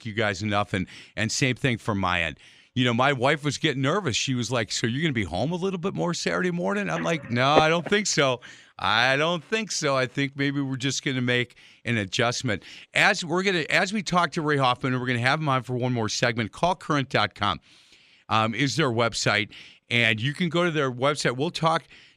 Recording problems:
none

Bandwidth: 14.5 kHz